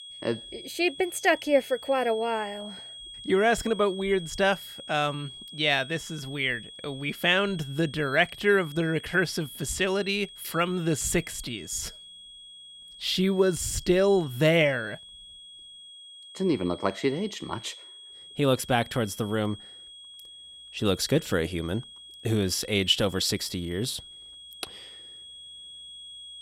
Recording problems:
high-pitched whine; noticeable; throughout; 3.5 kHz, 15 dB below the speech

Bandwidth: 16 kHz